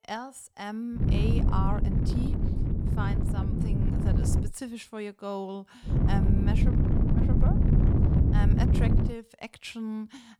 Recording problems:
wind noise on the microphone; heavy; from 1 to 4.5 s and from 6 to 9 s; 2 dB above the speech

